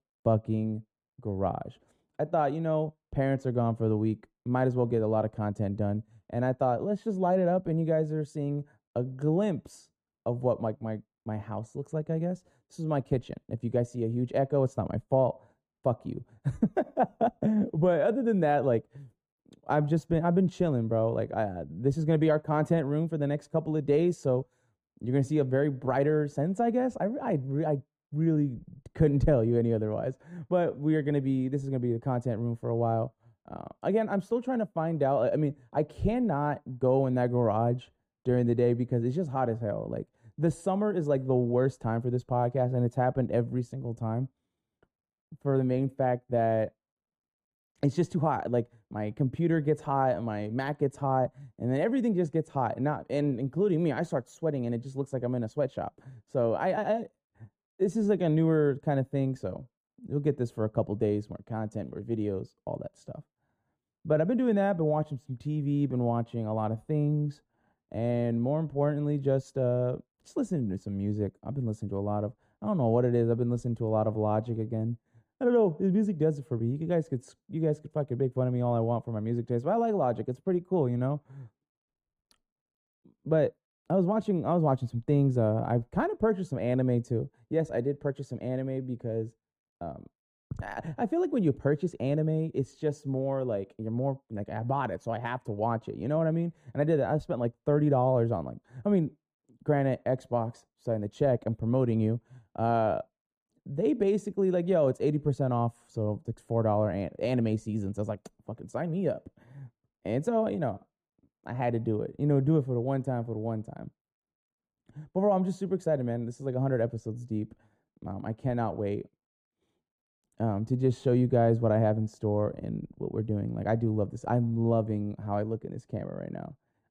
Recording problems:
muffled; very; fading above 1.5 kHz

